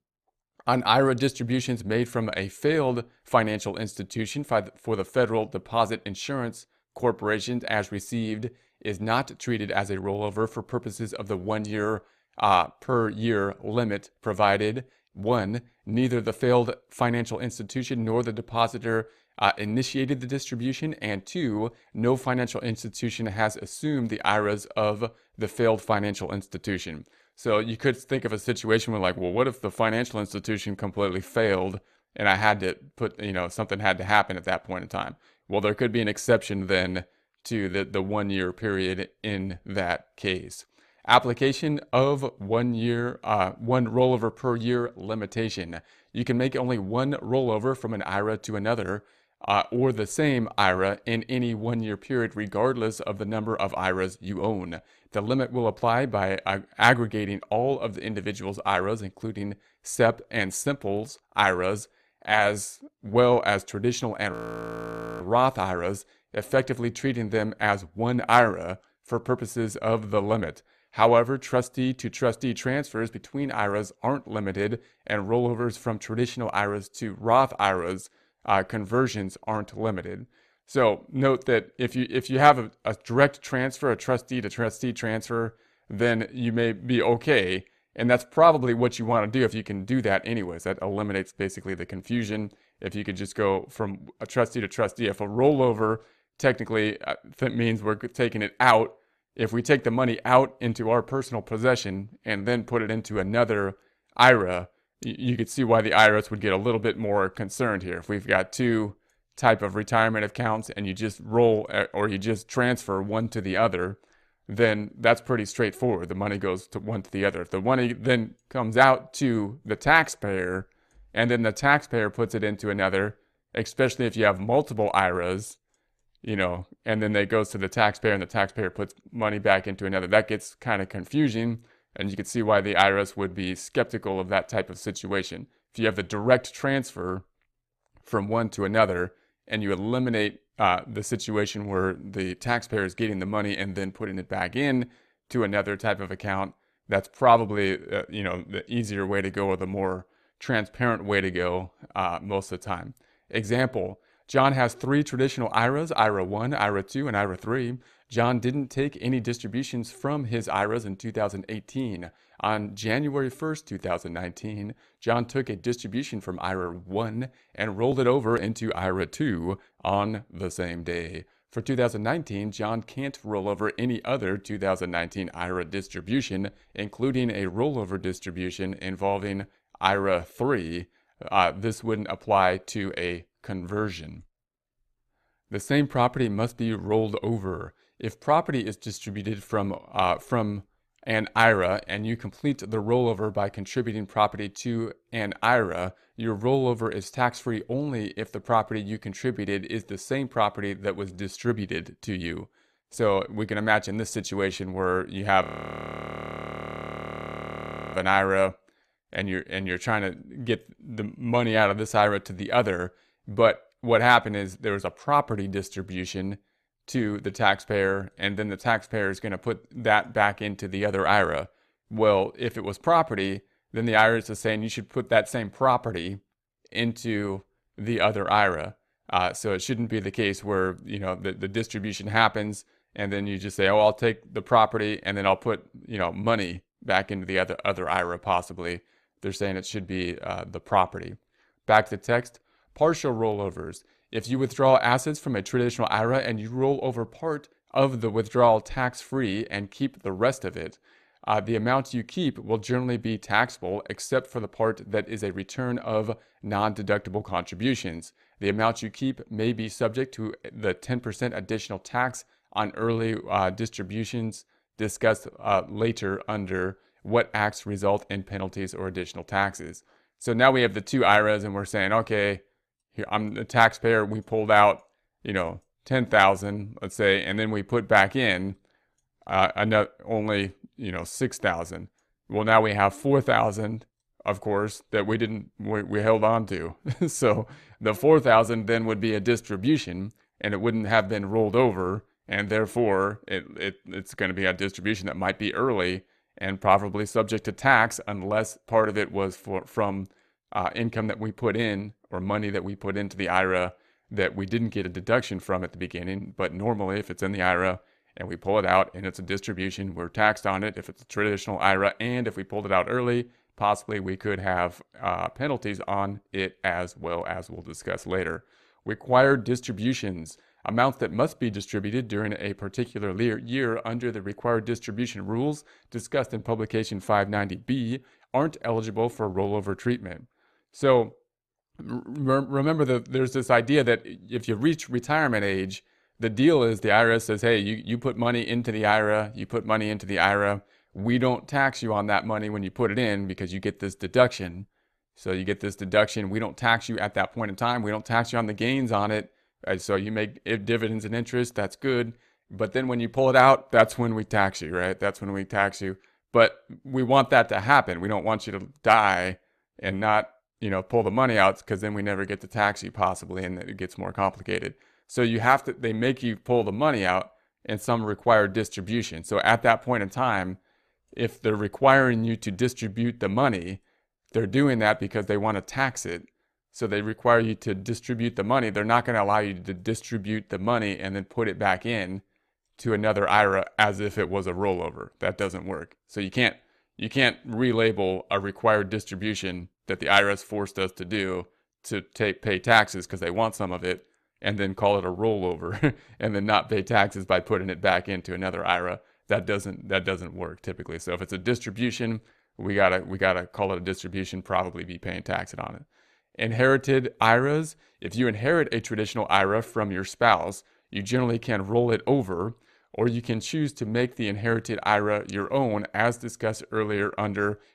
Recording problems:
audio freezing; at 1:04 for 1 s and at 3:25 for 2.5 s

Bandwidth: 14 kHz